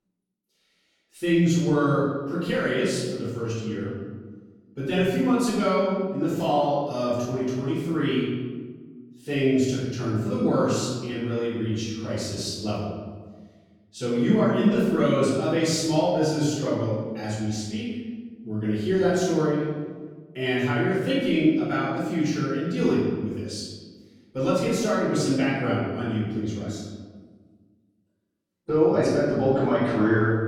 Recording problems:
room echo; strong; dies away in 1.3 s
off-mic speech; far

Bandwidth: 17.5 kHz